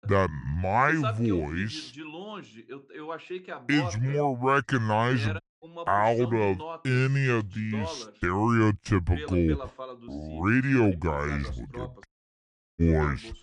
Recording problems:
wrong speed and pitch; too slow and too low; 0.7 times normal speed
voice in the background; noticeable; throughout; 15 dB below the speech
audio cutting out; at 5.5 s and at 12 s for 0.5 s

